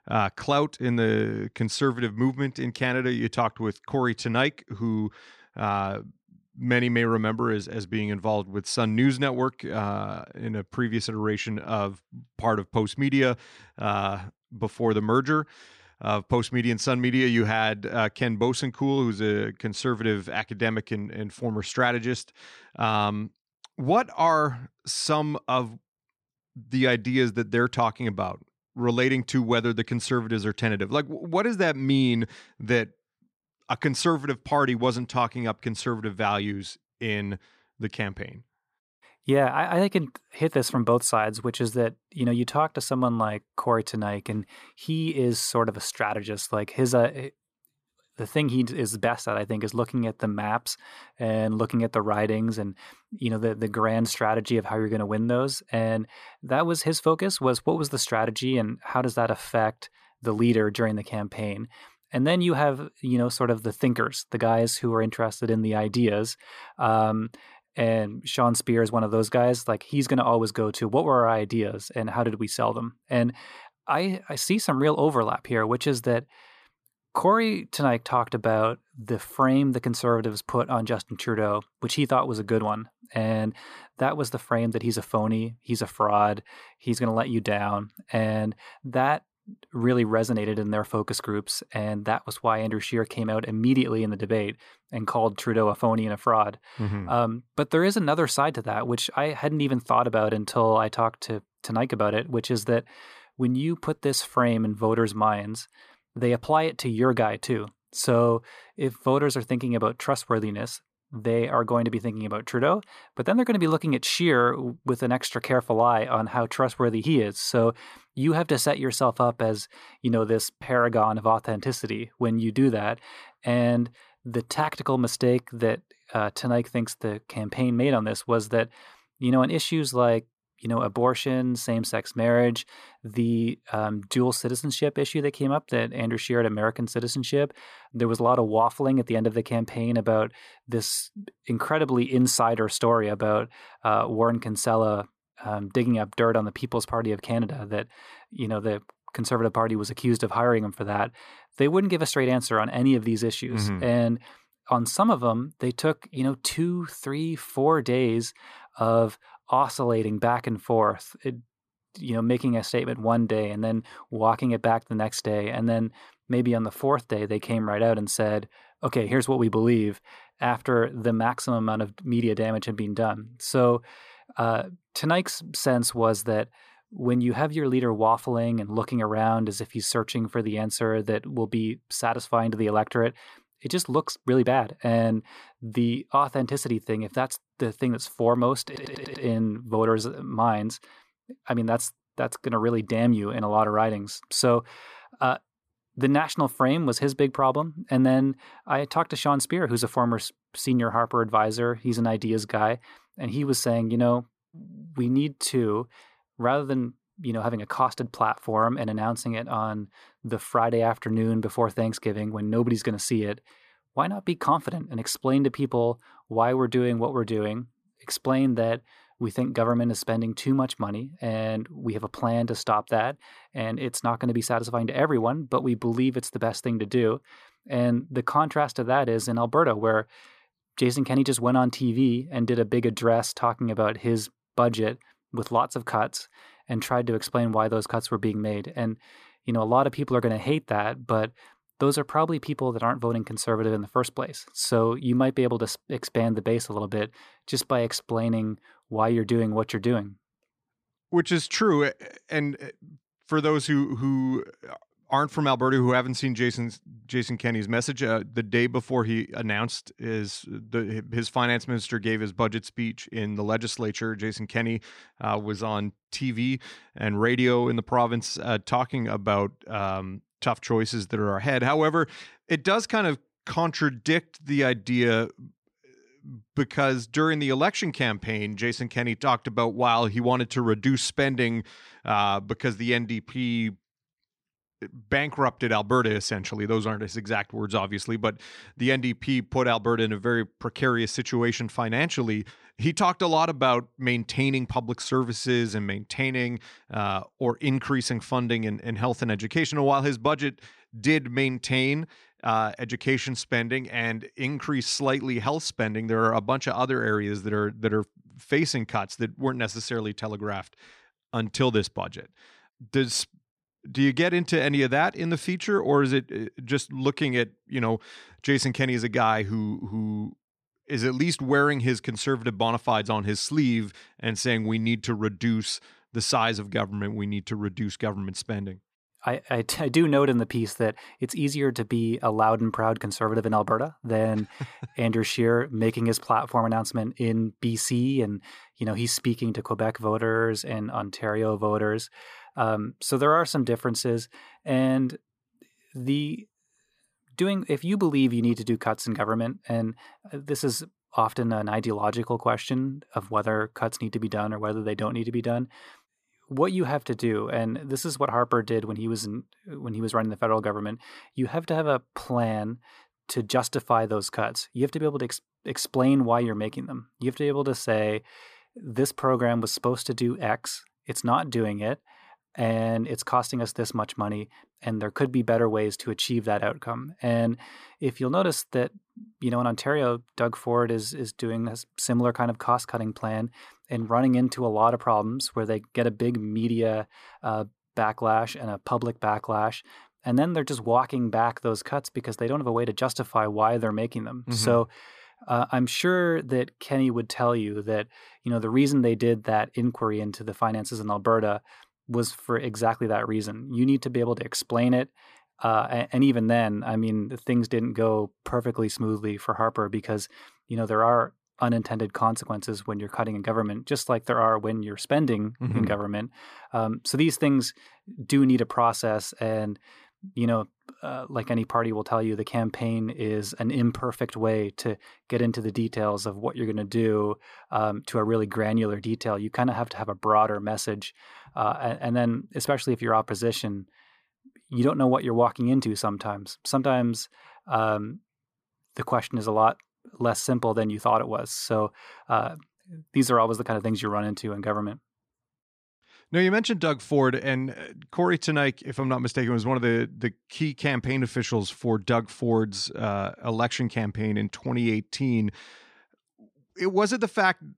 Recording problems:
audio stuttering; at 3:09

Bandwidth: 14.5 kHz